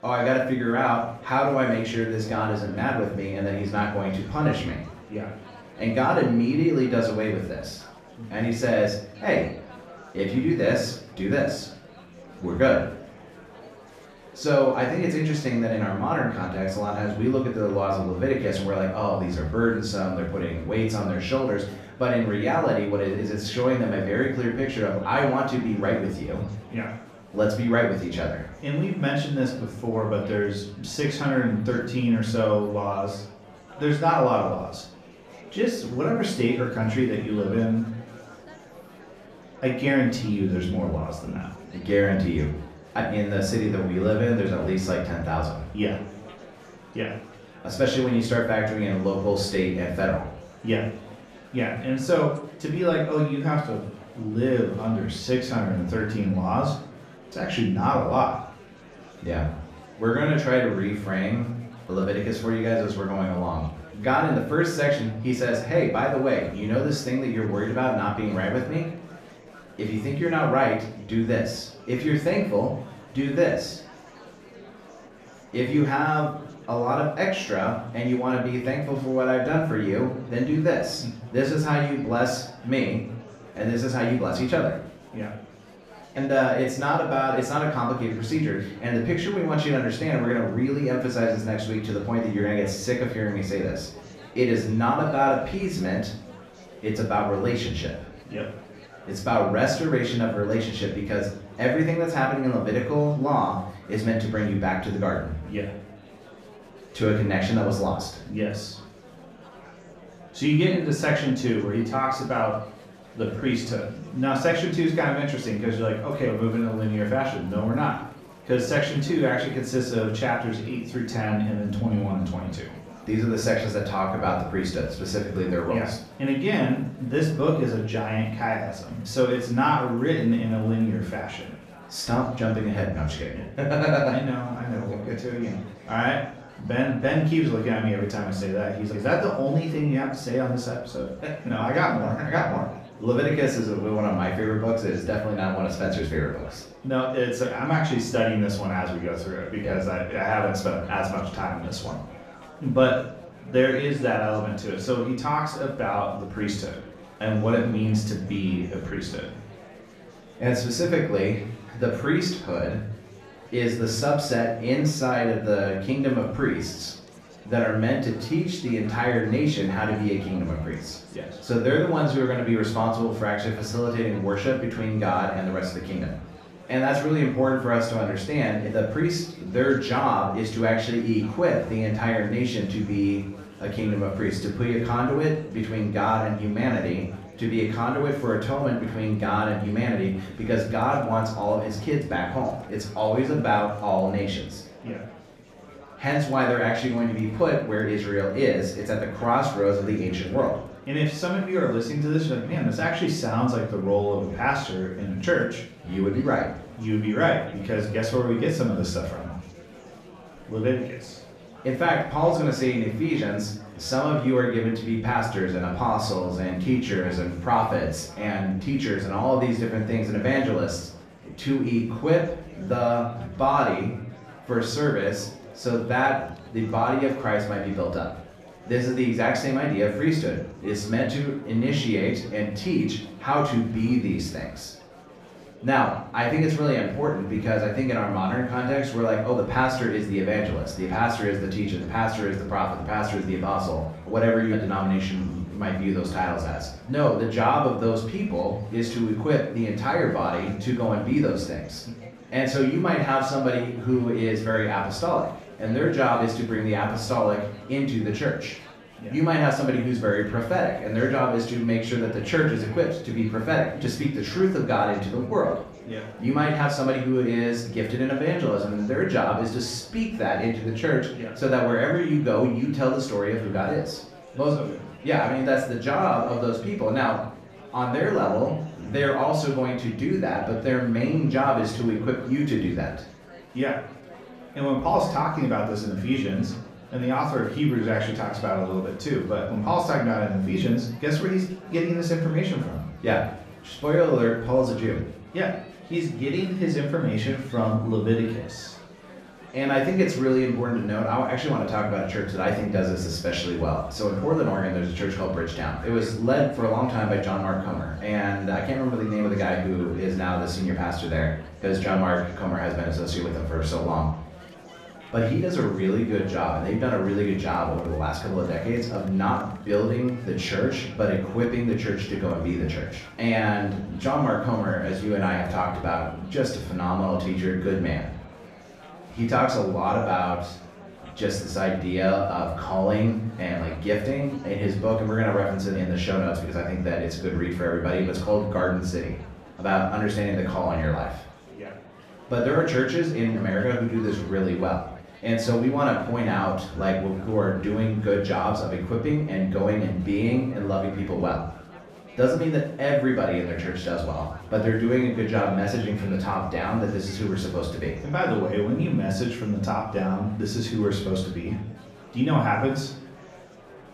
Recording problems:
off-mic speech; far
room echo; noticeable; dies away in 0.5 s
murmuring crowd; faint; throughout; 20 dB below the speech

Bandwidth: 14.5 kHz